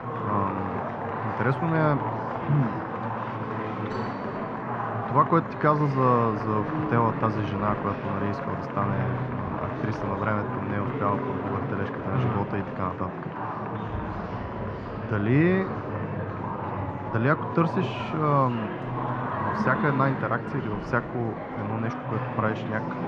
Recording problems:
muffled; very; fading above 1.5 kHz
murmuring crowd; loud; throughout; 4 dB below the speech

